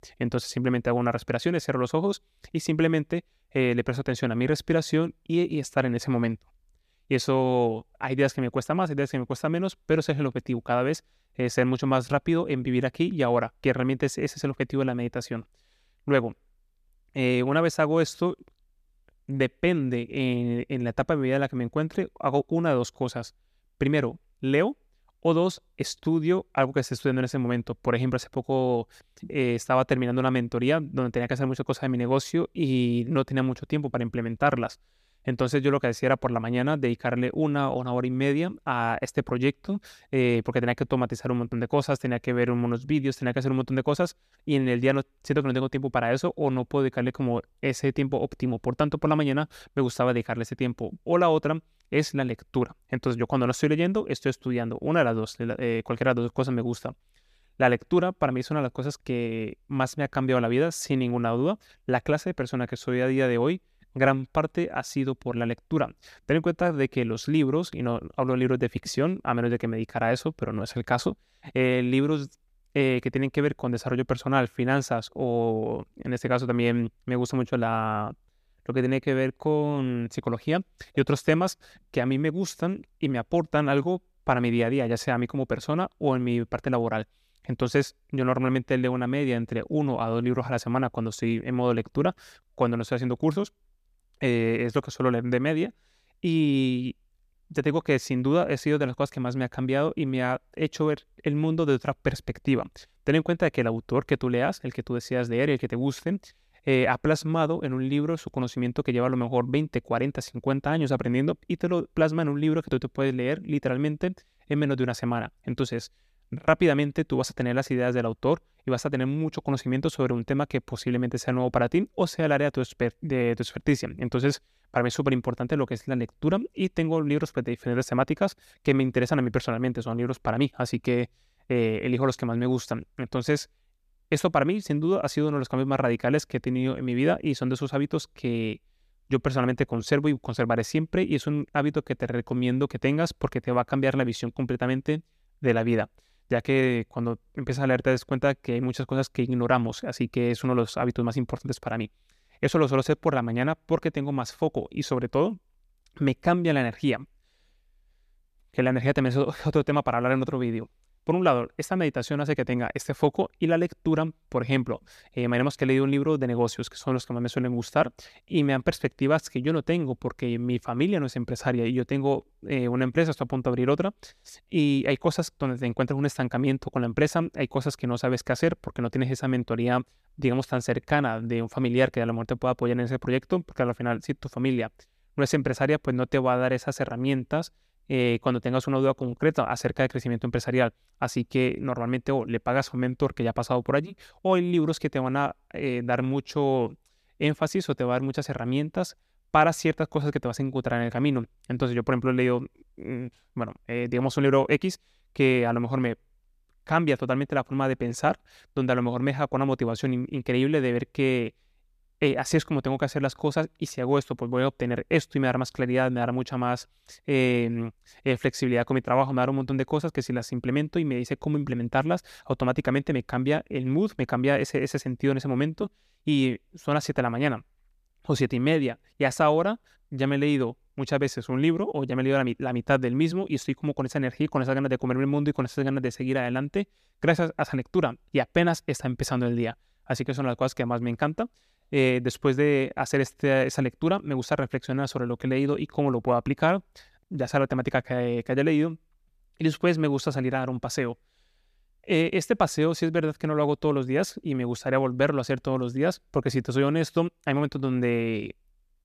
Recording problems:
none

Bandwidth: 14.5 kHz